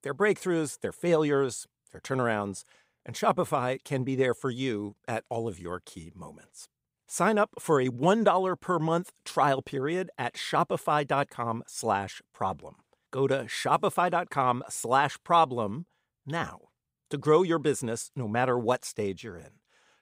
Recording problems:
none

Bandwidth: 15.5 kHz